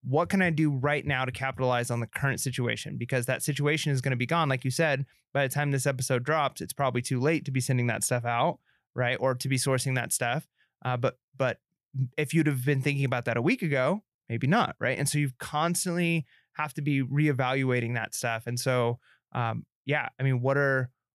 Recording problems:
none

